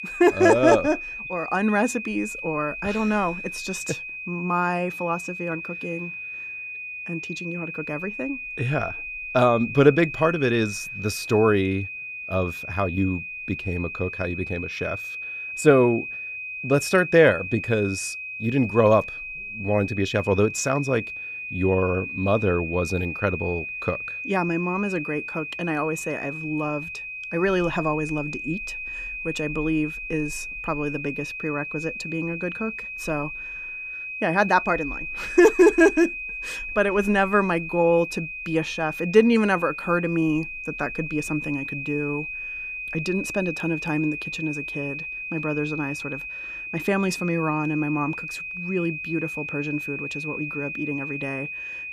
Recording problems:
high-pitched whine; loud; throughout; 2.5 kHz, 7 dB below the speech

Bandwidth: 14.5 kHz